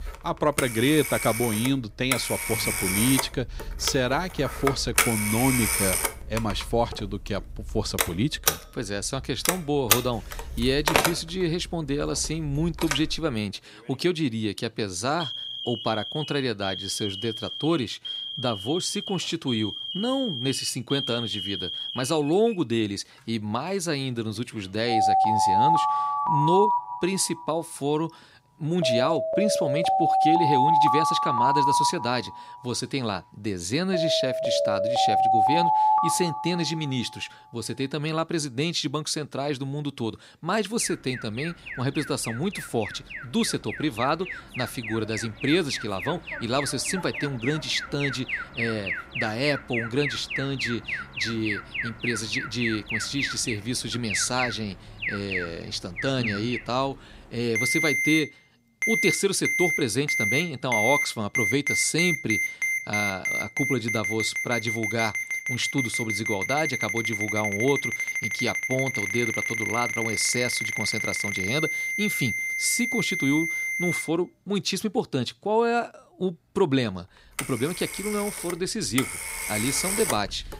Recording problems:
alarms or sirens; very loud; throughout; 1 dB above the speech

